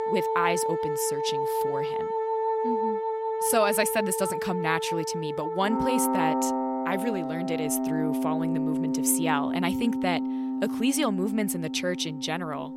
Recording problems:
background music; very loud; throughout; as loud as the speech

